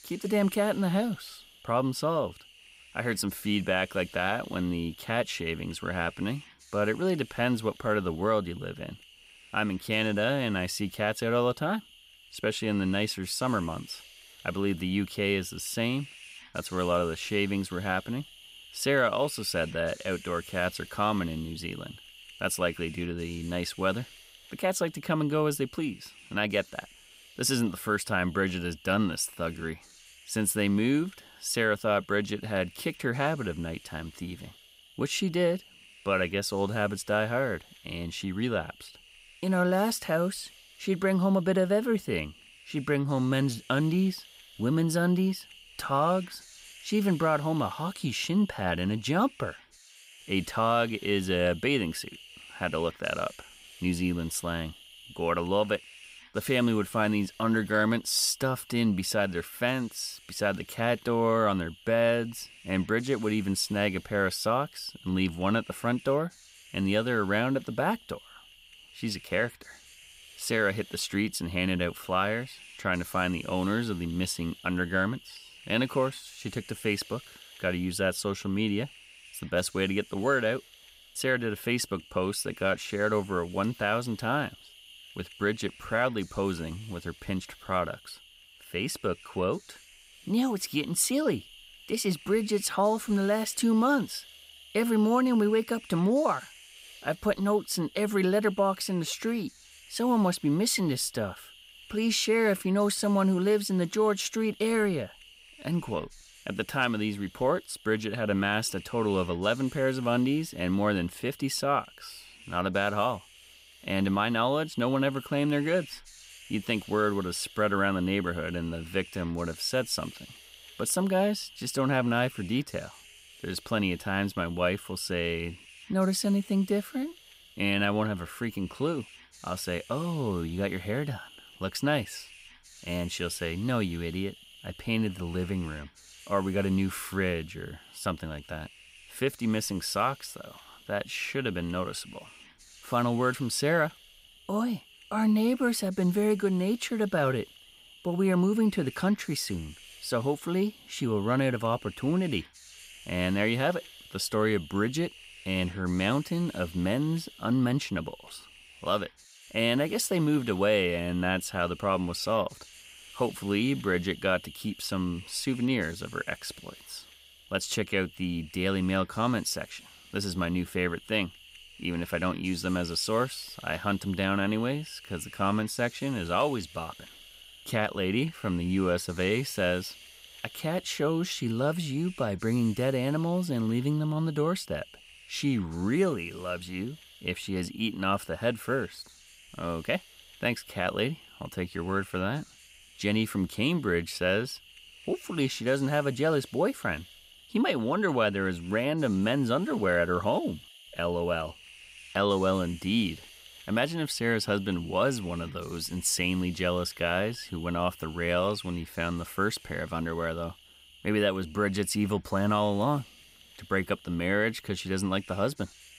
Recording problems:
hiss; faint; throughout; 20 dB below the speech

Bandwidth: 15.5 kHz